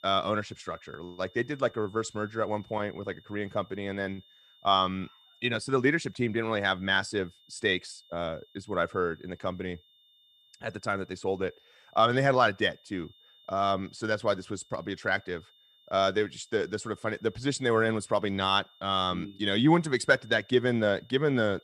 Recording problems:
high-pitched whine; faint; throughout; 3.5 kHz, 30 dB below the speech

